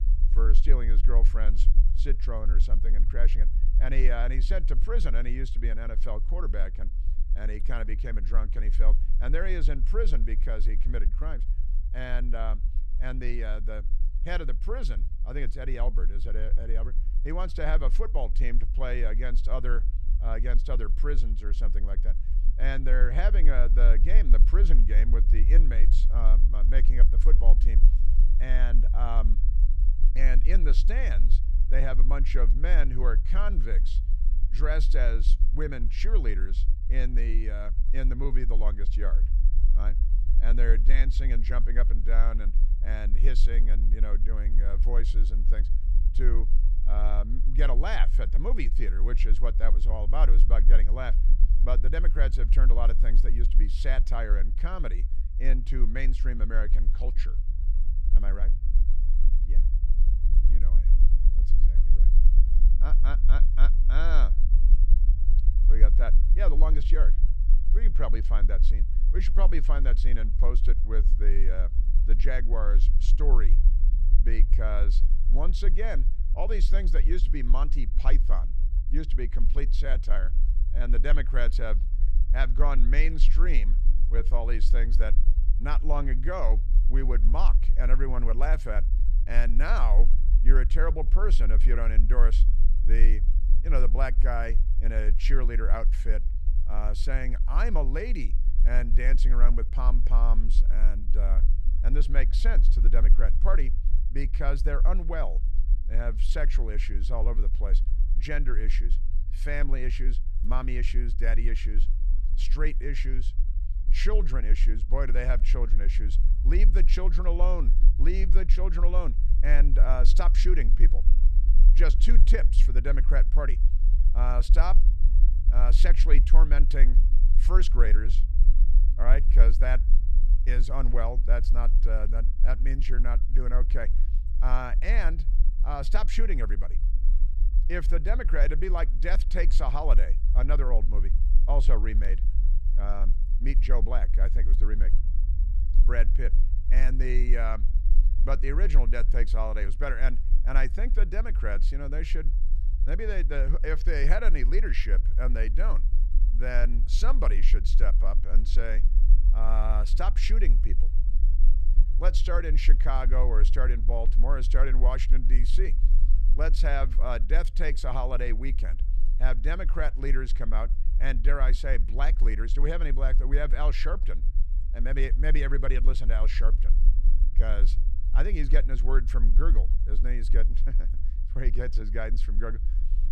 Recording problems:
low rumble; noticeable; throughout; 15 dB below the speech

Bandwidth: 14.5 kHz